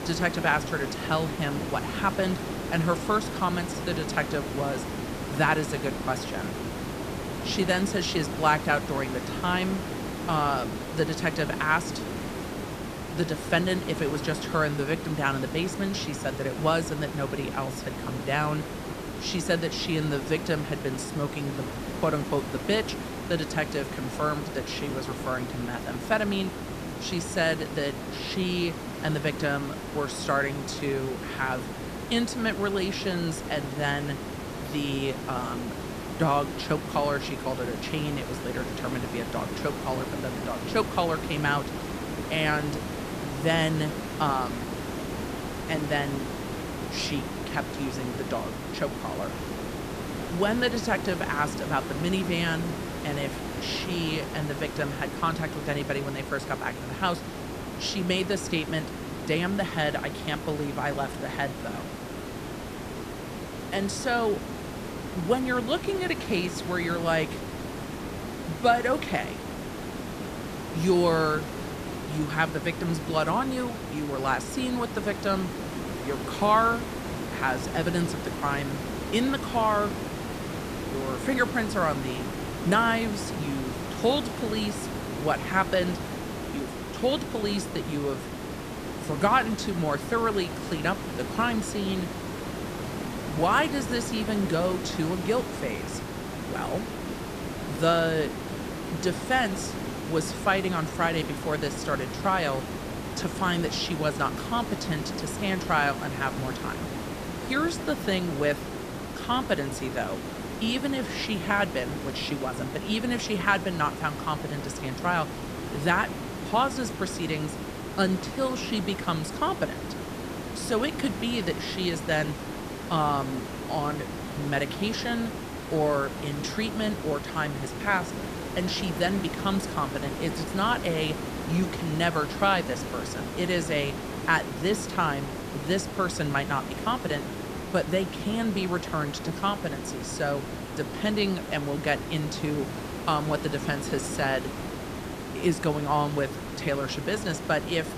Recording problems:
hiss; loud; throughout; 6 dB below the speech

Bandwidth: 14.5 kHz